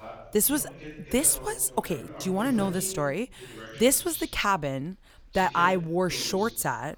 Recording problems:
voice in the background; noticeable; throughout; 15 dB below the speech

